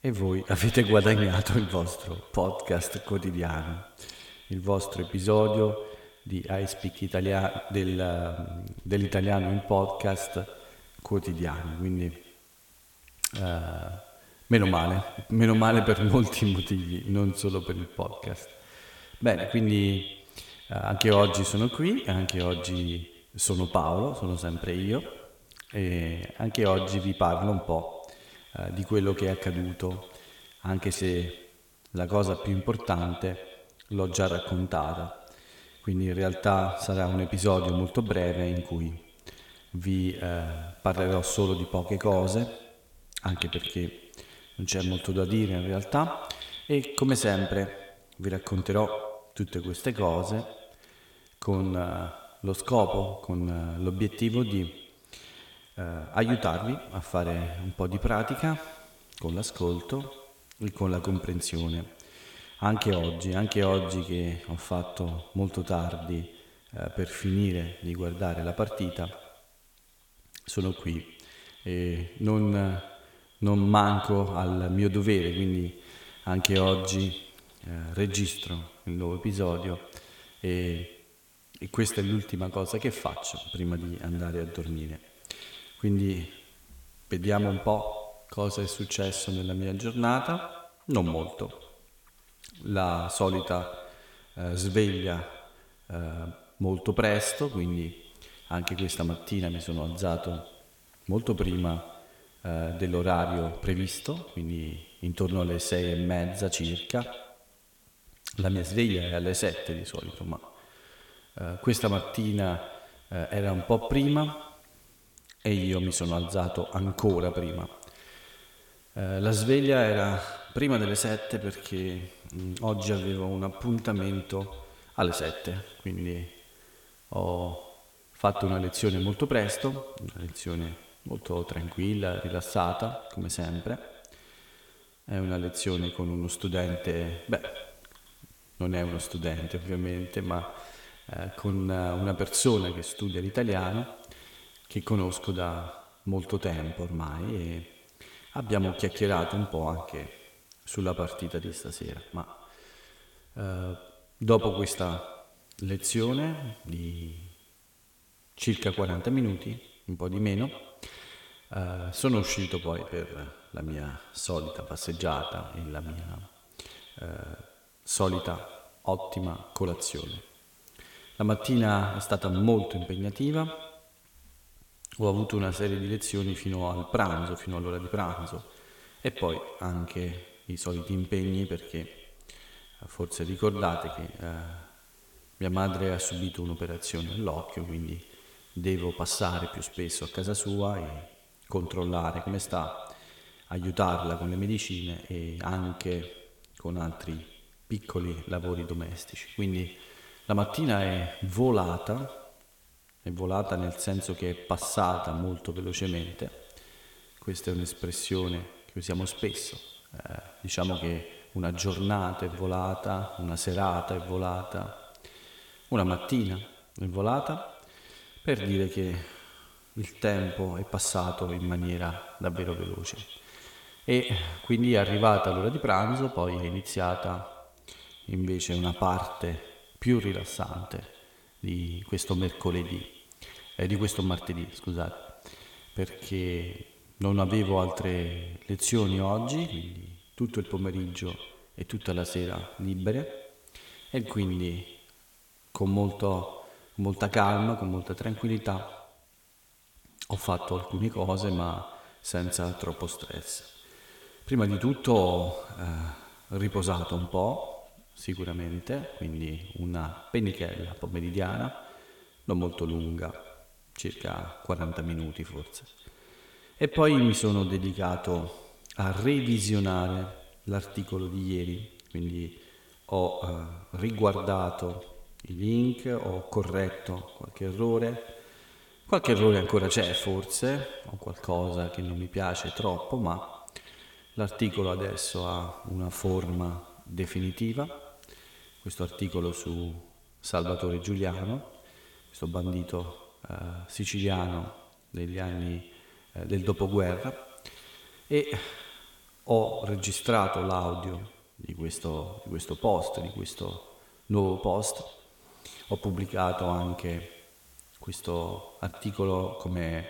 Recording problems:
echo of what is said; strong; throughout; 110 ms later, 10 dB below the speech
hiss; faint; throughout; 30 dB below the speech

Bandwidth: 17 kHz